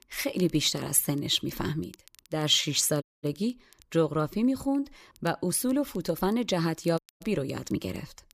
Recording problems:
crackle, like an old record; faint; 30 dB below the speech
audio cutting out; at 3 s and at 7 s
uneven, jittery; slightly; from 4.5 to 8 s

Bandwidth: 14.5 kHz